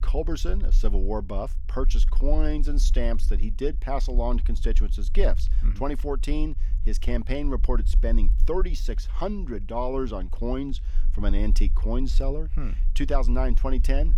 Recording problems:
low rumble; noticeable; throughout; 20 dB below the speech

